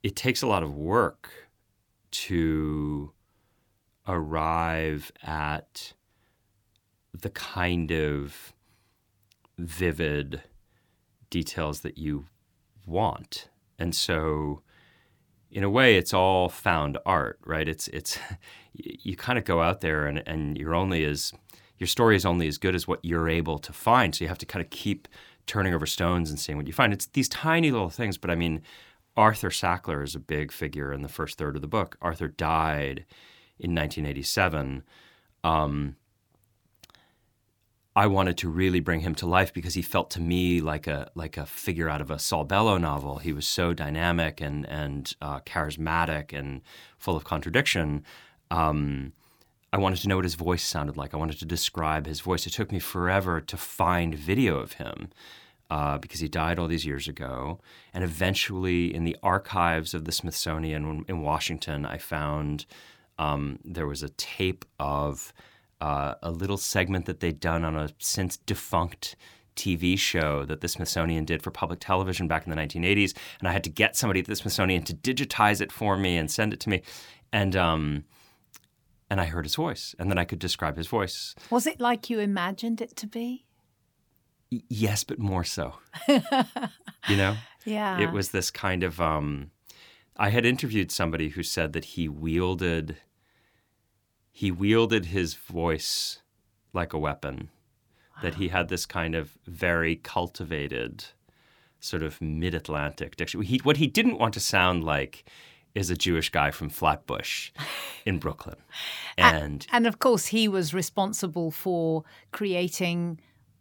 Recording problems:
none

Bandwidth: 19 kHz